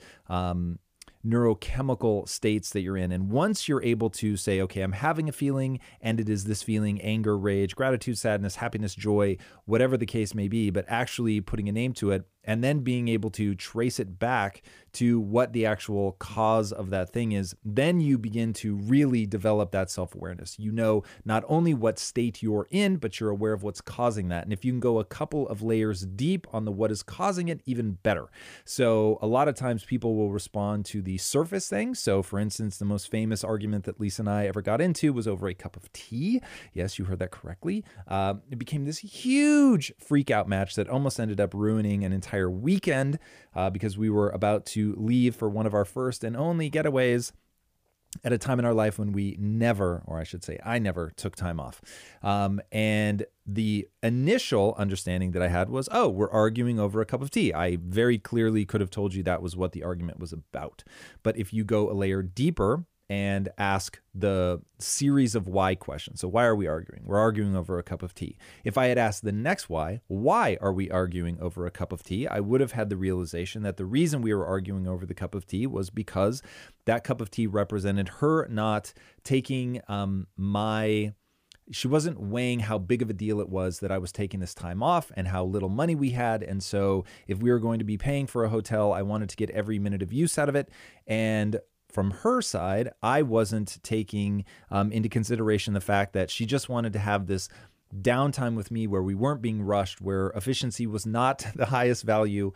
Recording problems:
none

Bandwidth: 15 kHz